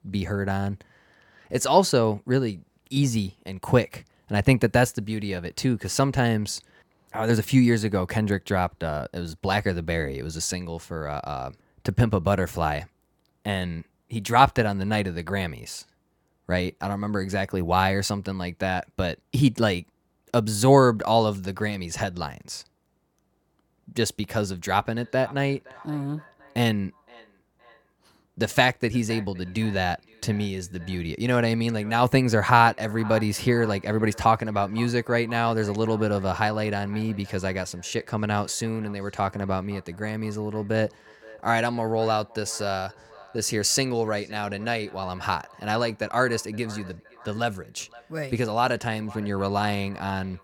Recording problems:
echo of what is said; faint; from 25 s on; 520 ms later, 20 dB below the speech

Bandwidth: 18 kHz